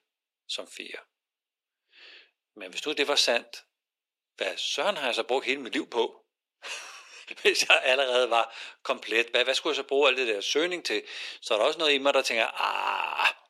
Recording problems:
thin; very; fading below 400 Hz

